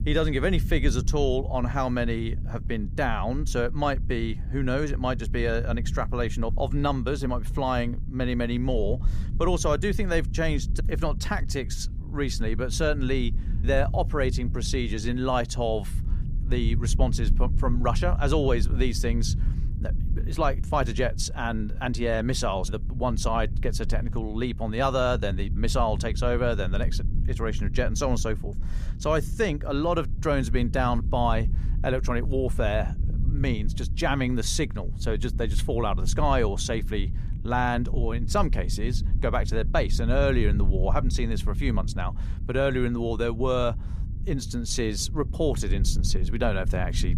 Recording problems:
low rumble; noticeable; throughout; 15 dB below the speech

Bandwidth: 15 kHz